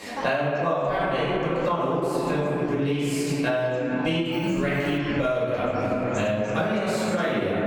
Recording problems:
room echo; strong; dies away in 2.8 s
off-mic speech; far
squashed, flat; somewhat
background chatter; noticeable; throughout; 4 voices, 15 dB below the speech
alarm; noticeable; at 4.5 s; peak 7 dB below the speech

